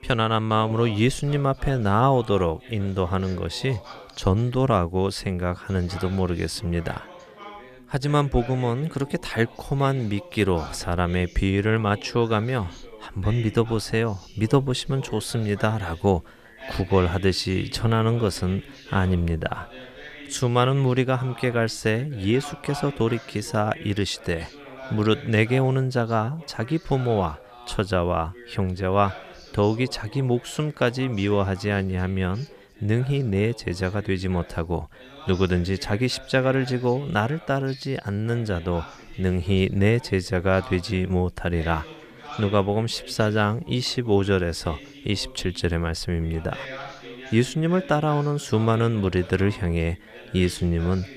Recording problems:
background chatter; noticeable; throughout; 2 voices, 20 dB below the speech

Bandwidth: 14.5 kHz